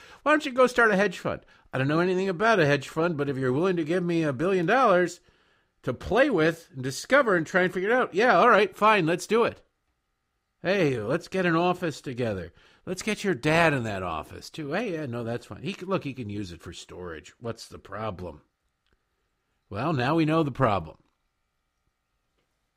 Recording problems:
none

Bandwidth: 15.5 kHz